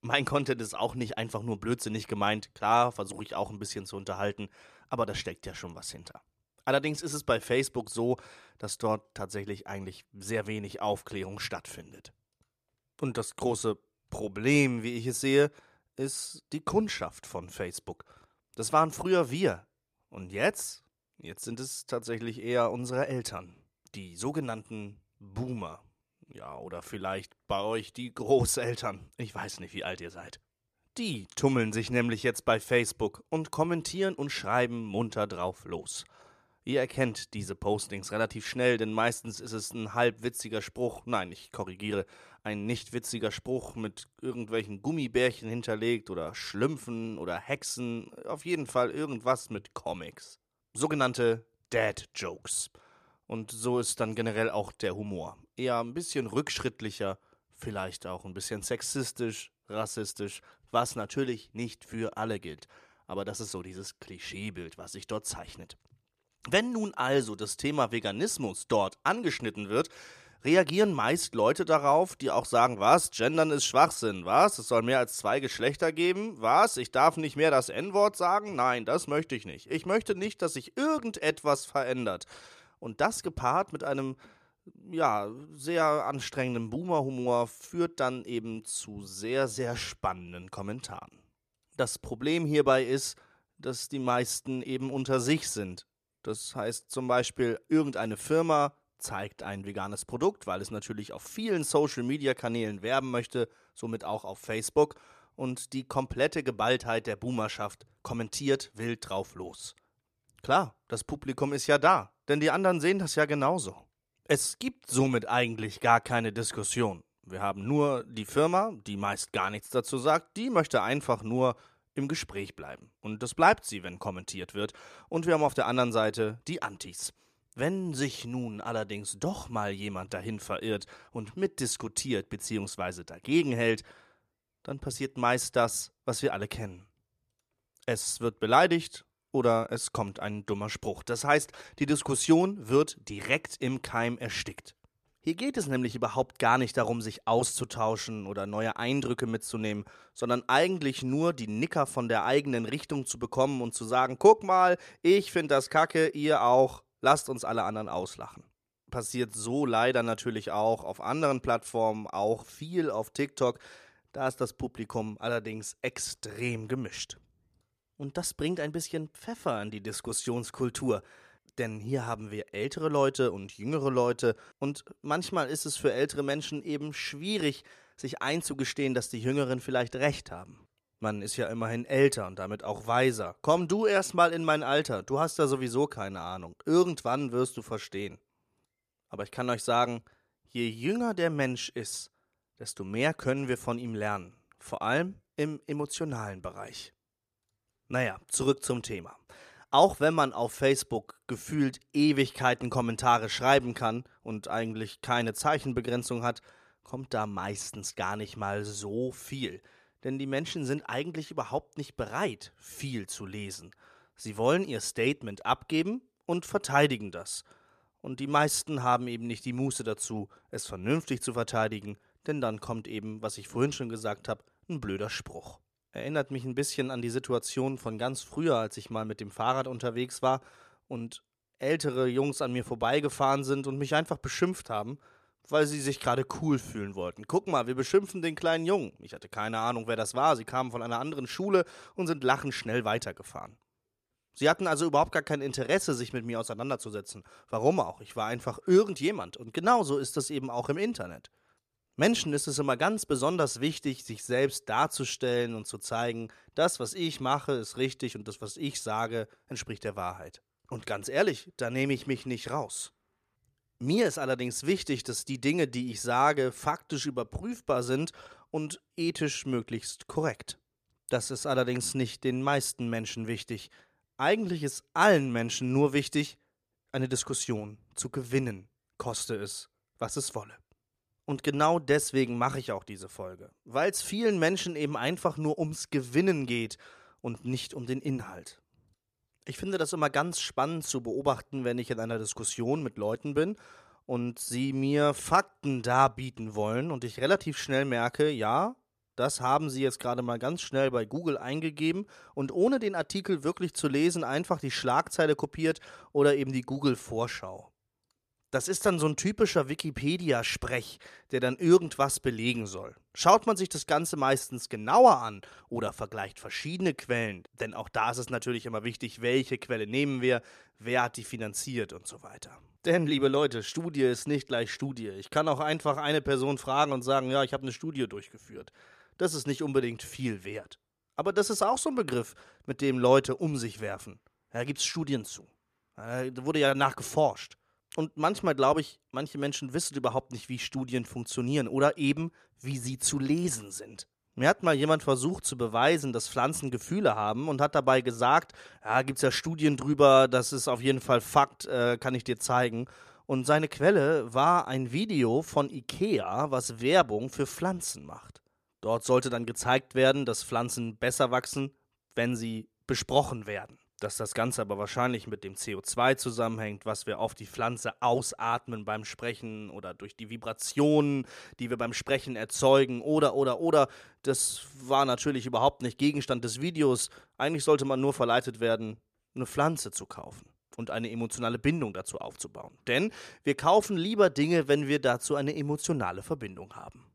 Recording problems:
none

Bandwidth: 14.5 kHz